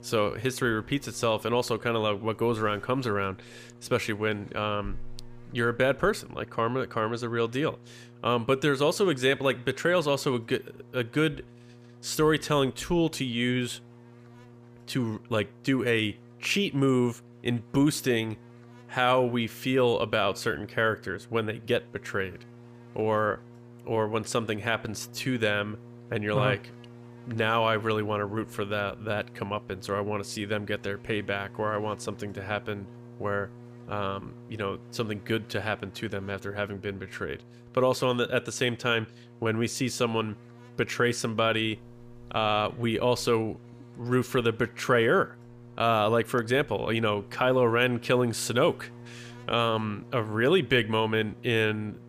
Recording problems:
electrical hum; faint; throughout; 60 Hz, 25 dB below the speech

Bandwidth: 15 kHz